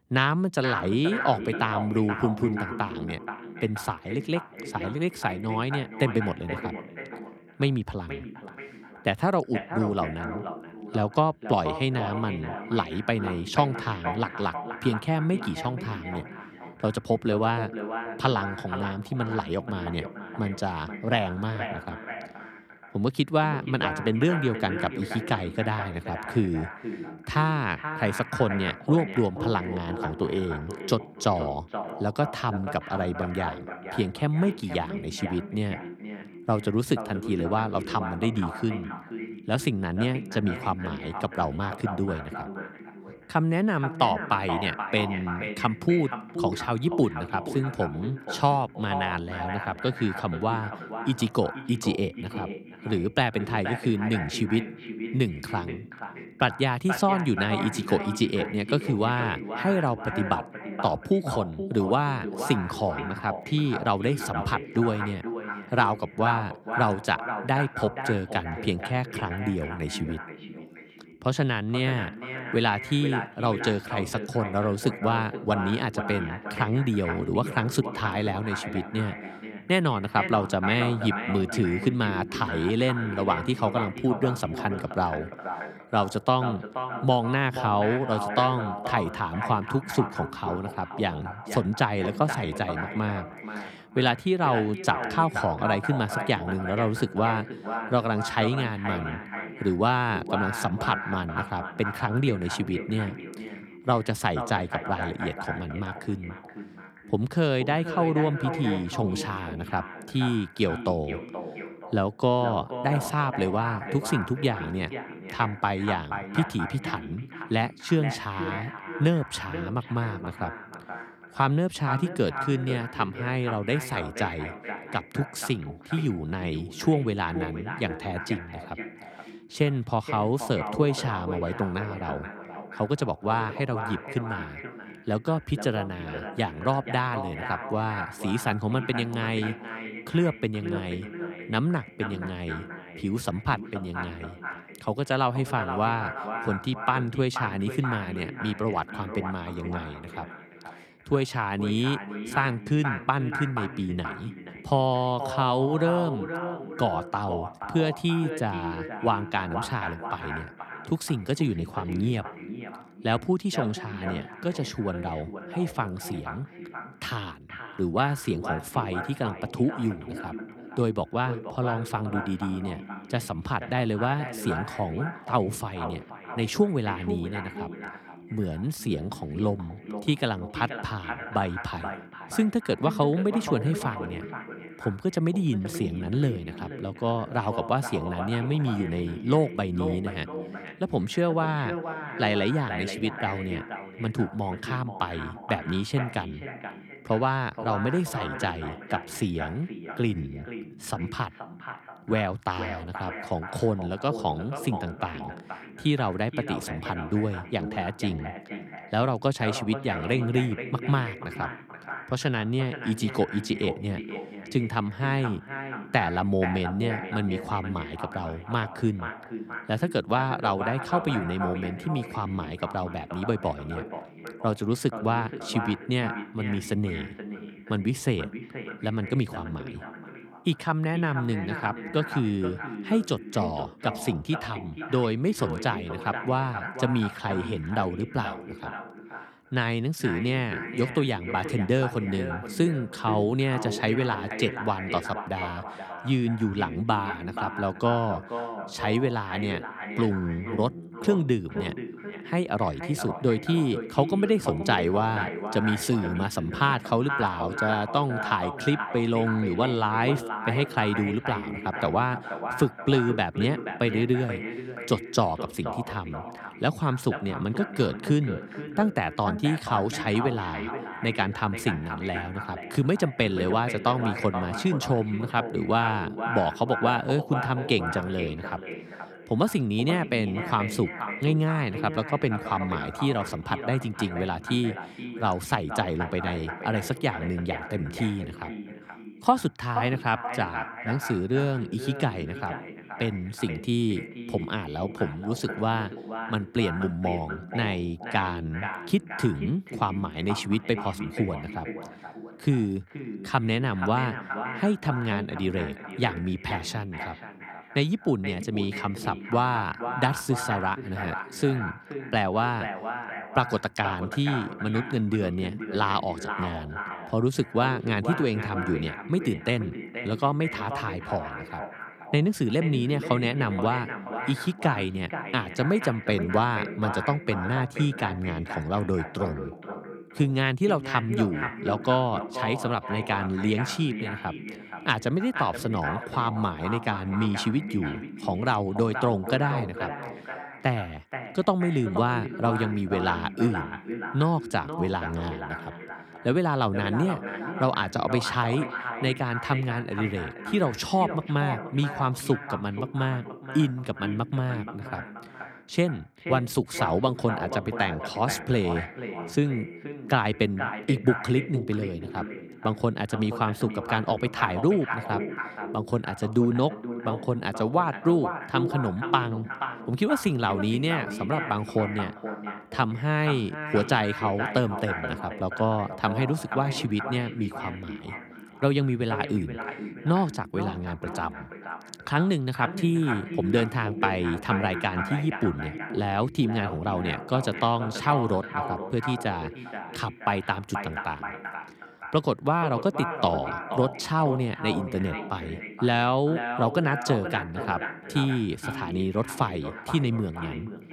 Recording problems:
echo of what is said; strong; throughout; 480 ms later, 8 dB below the speech

